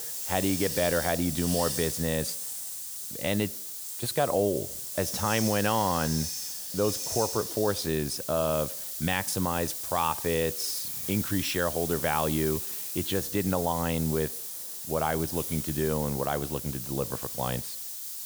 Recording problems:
hiss; loud; throughout; 3 dB below the speech

